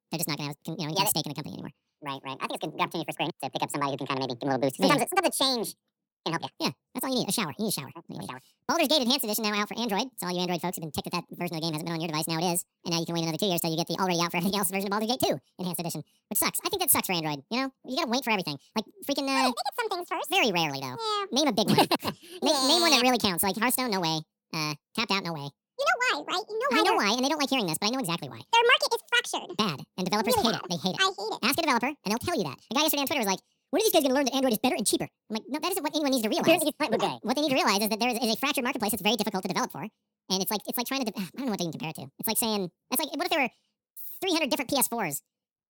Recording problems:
wrong speed and pitch; too fast and too high; 1.7 times normal speed

